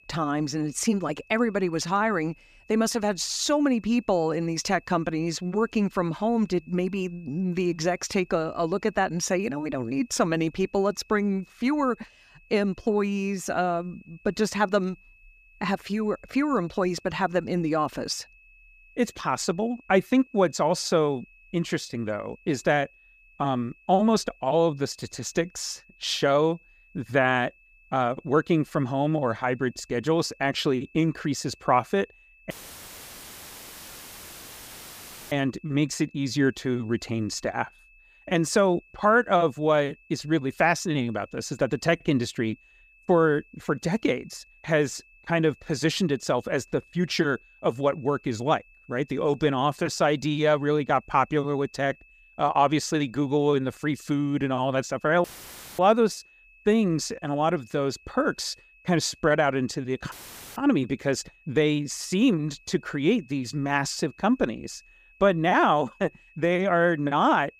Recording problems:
high-pitched whine; faint; throughout; 2.5 kHz, 30 dB below the speech
audio cutting out; filled with static; at 33 s for 3 s, at 55 s for 0.5 s and at 1:00

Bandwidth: 15 kHz